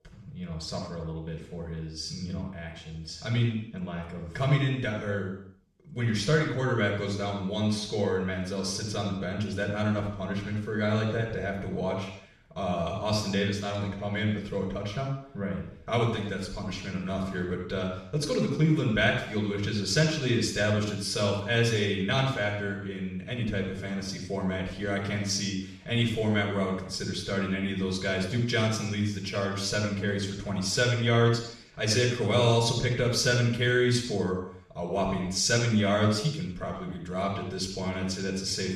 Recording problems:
off-mic speech; far
room echo; noticeable; dies away in 0.7 s

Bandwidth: 13.5 kHz